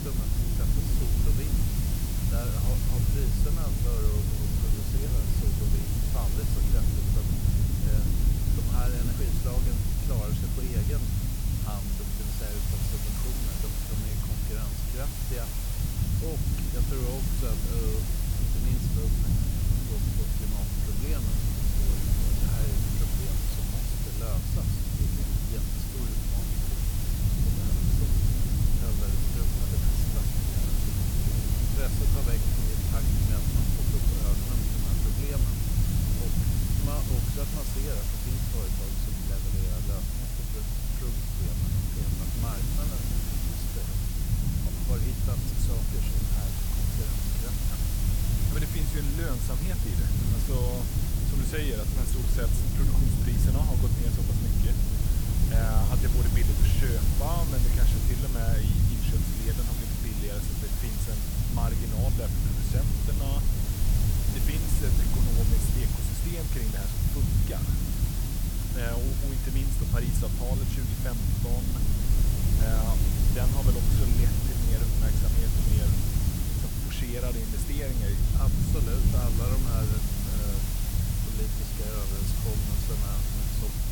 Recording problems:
hiss; very loud; throughout; 4 dB above the speech
low rumble; loud; throughout; as loud as the speech

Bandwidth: 18.5 kHz